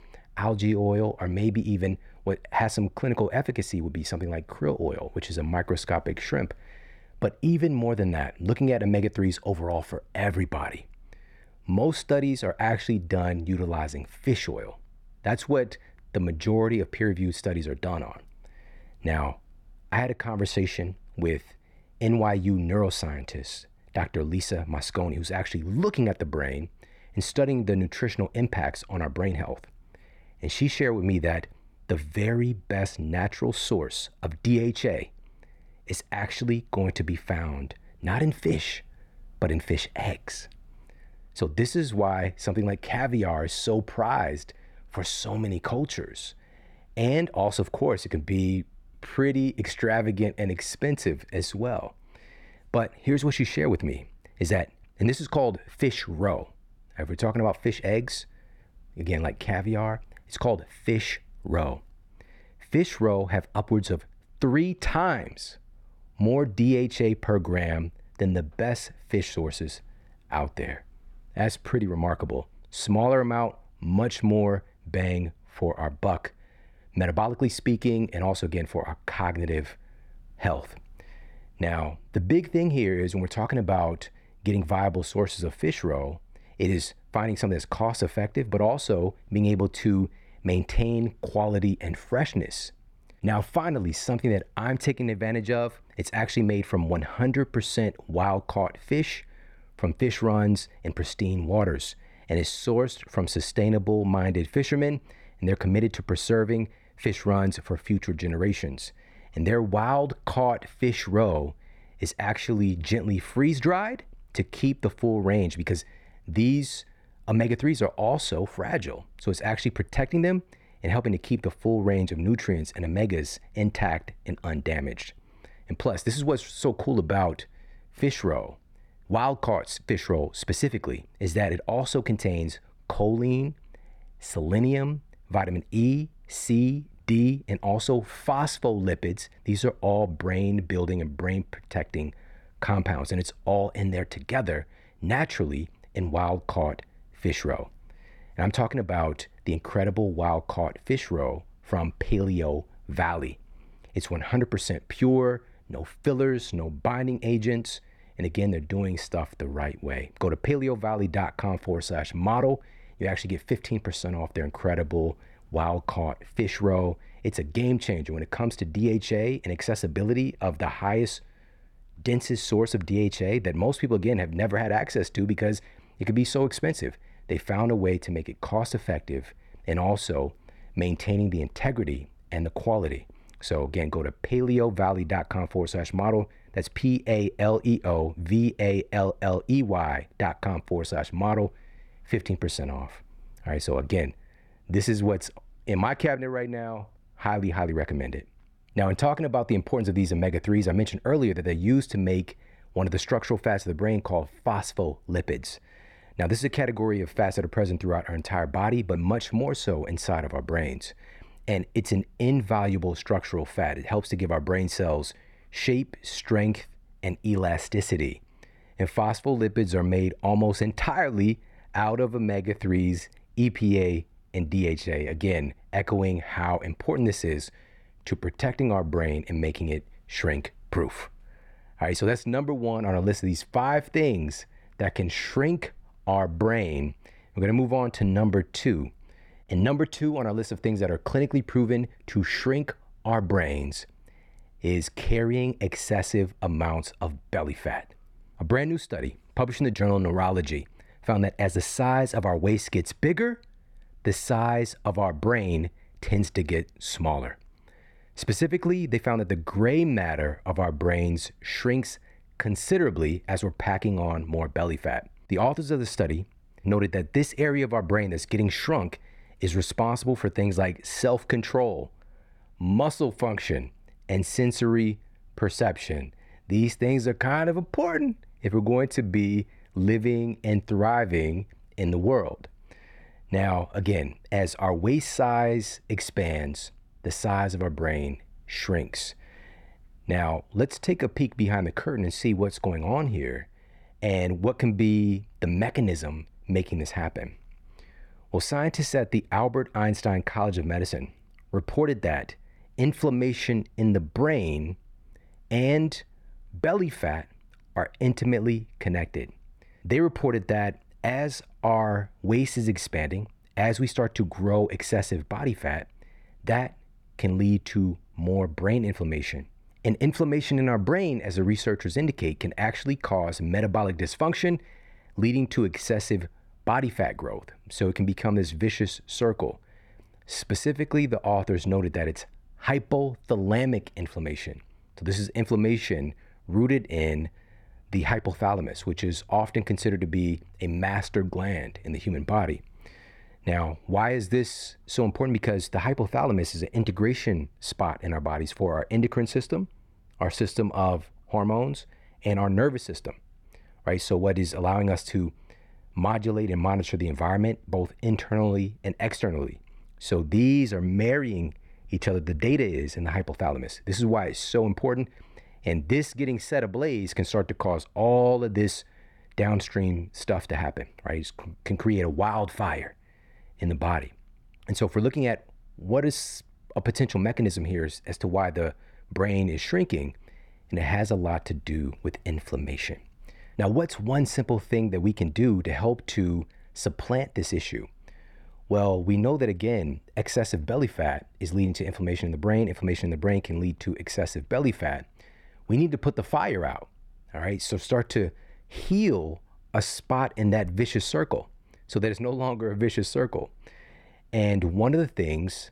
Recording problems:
muffled; very slightly; fading above 4 kHz

